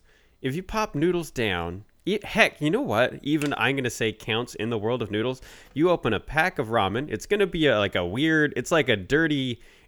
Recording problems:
none

